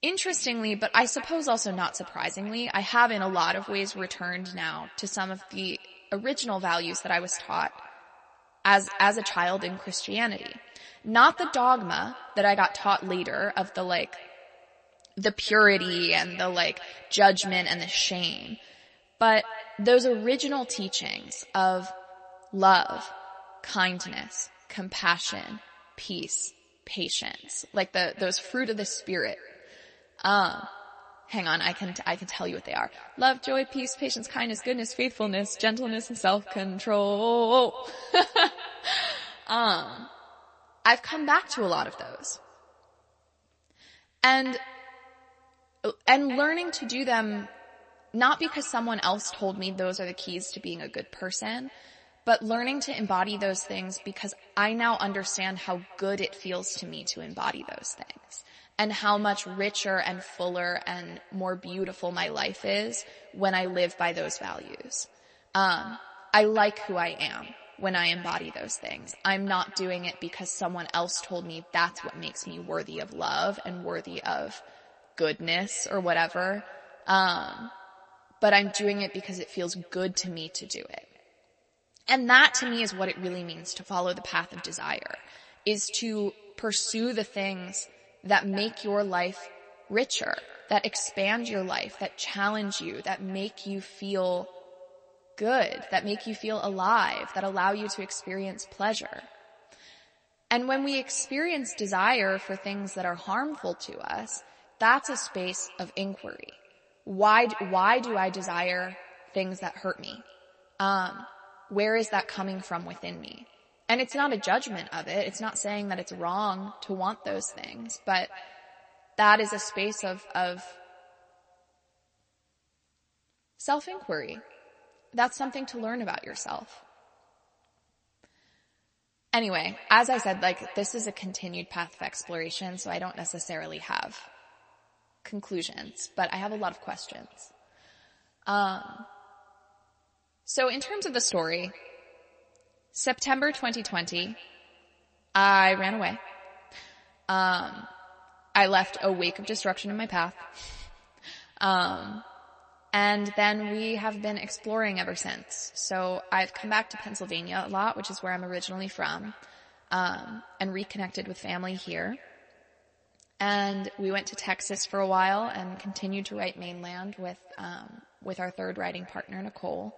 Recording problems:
echo of what is said; faint; throughout; 220 ms later, 20 dB below the speech
garbled, watery; slightly; nothing above 8 kHz

